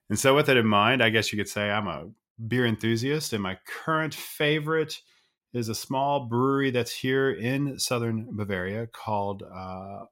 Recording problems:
none

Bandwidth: 16 kHz